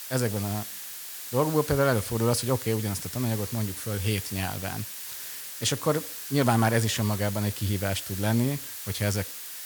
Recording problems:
hiss; loud; throughout; 7 dB below the speech

